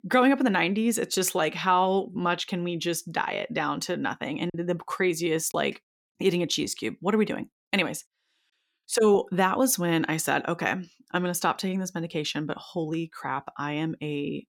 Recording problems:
choppy; occasionally; from 4.5 to 5.5 s; 1% of the speech affected

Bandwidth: 17.5 kHz